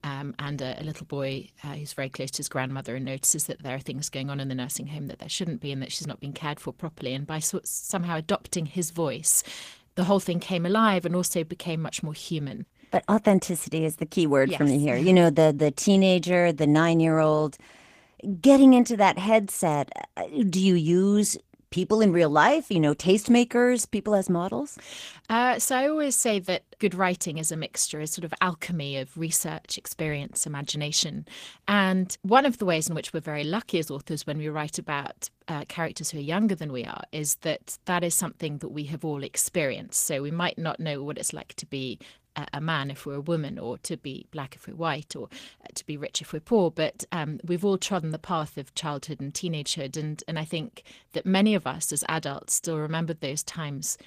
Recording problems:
garbled, watery; slightly; nothing above 15 kHz

